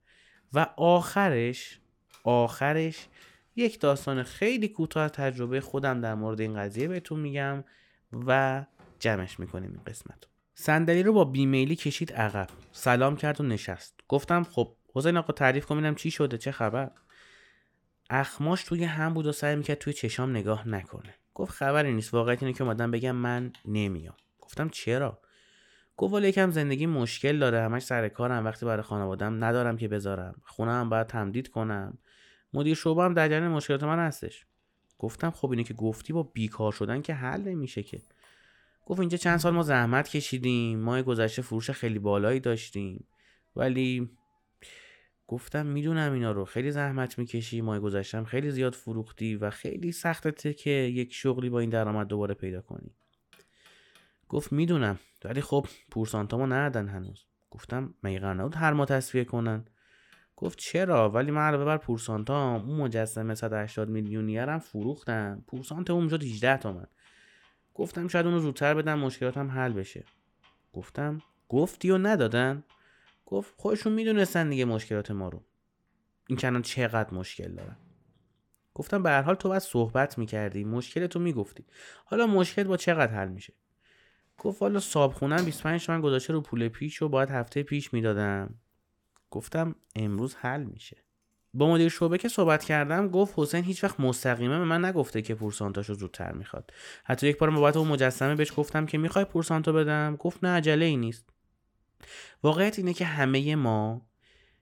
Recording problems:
household noises; faint; throughout; 30 dB below the speech

